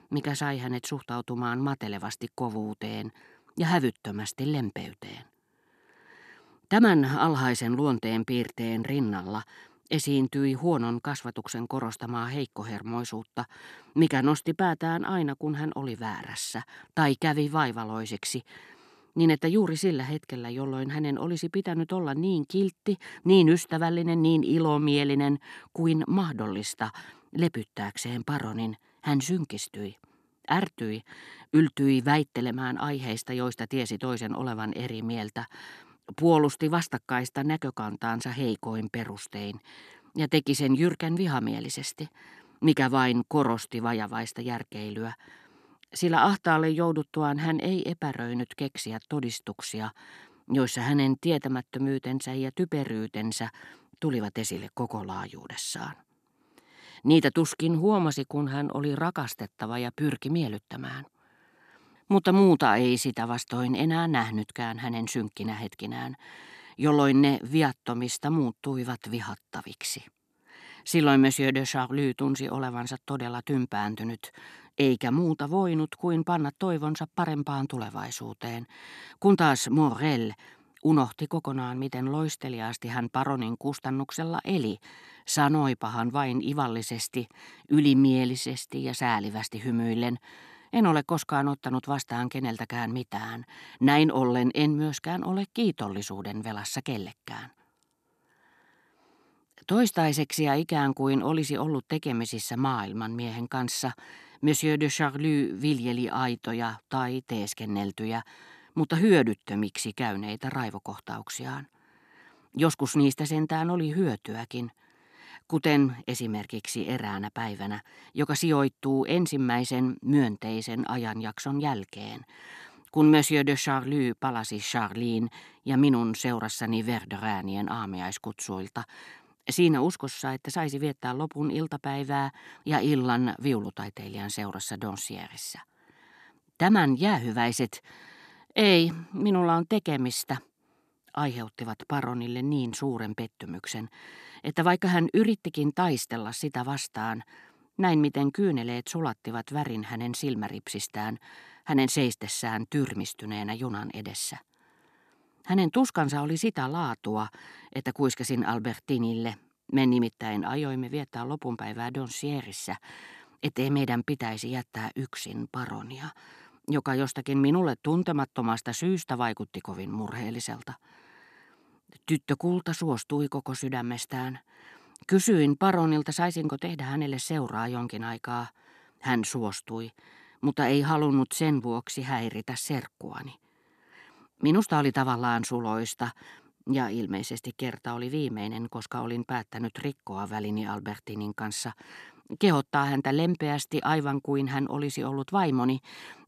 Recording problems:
none

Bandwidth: 14 kHz